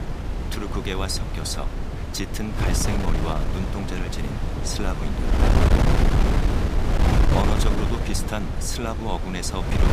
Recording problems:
wind noise on the microphone; heavy; 1 dB above the speech

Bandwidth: 15 kHz